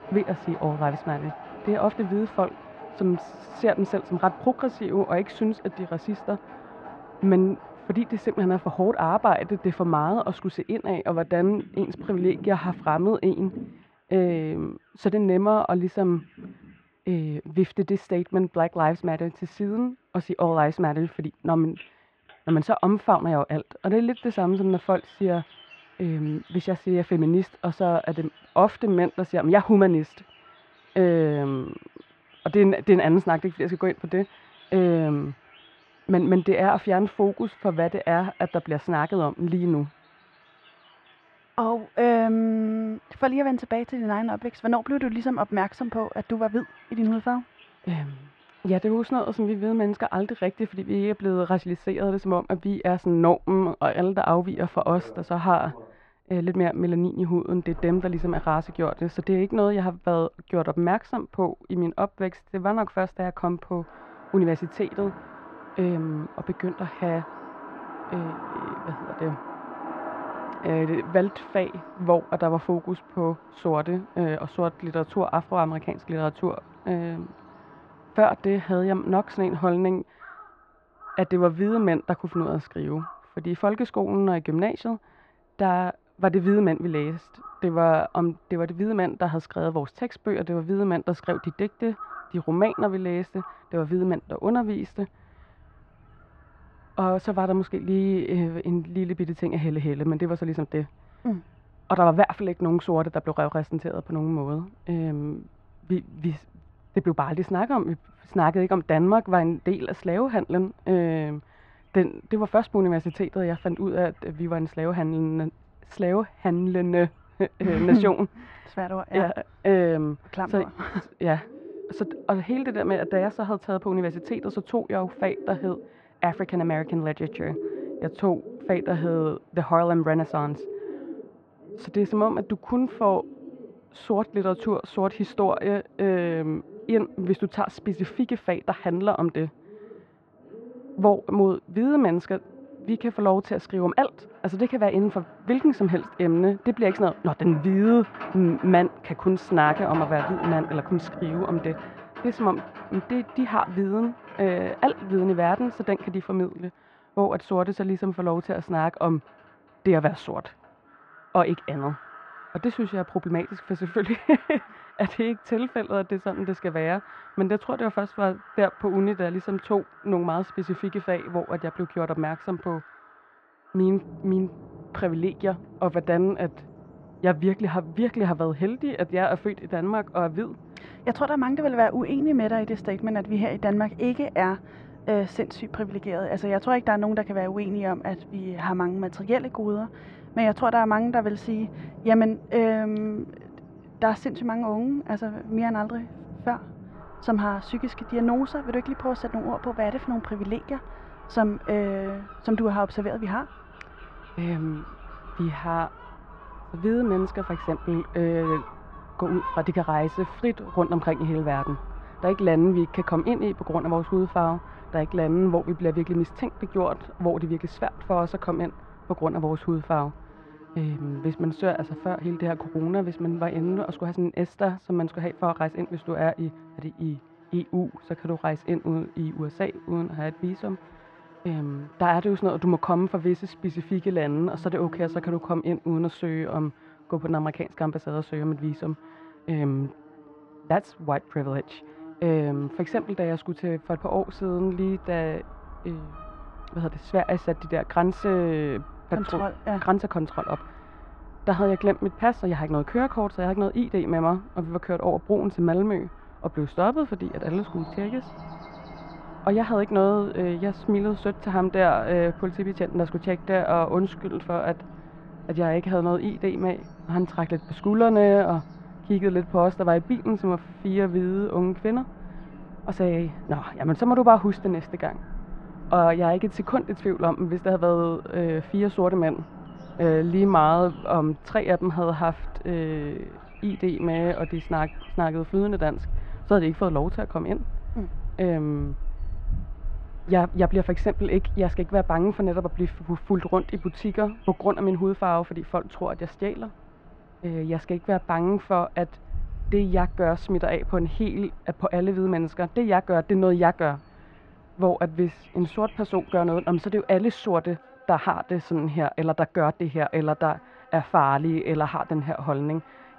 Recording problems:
muffled; very; fading above 2 kHz
animal sounds; noticeable; throughout; 15 dB below the speech

